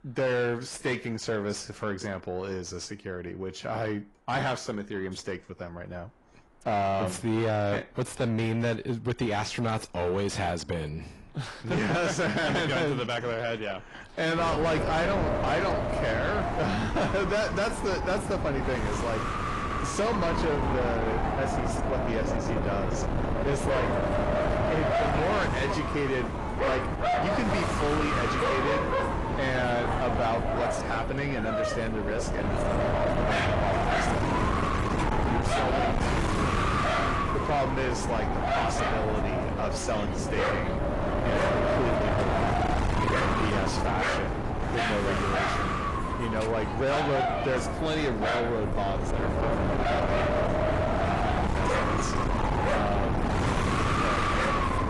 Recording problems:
distortion; heavy; 6 dB below the speech
garbled, watery; slightly; nothing above 10.5 kHz
wind noise on the microphone; heavy; from 14 s on; 1 dB above the speech
animal sounds; loud; throughout; 2 dB below the speech

